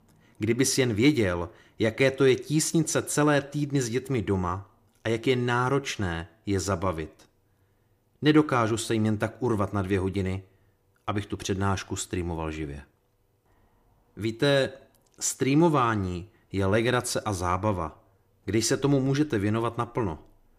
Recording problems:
none

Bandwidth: 15 kHz